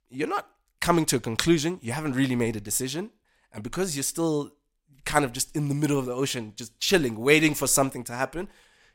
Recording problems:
none

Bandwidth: 16 kHz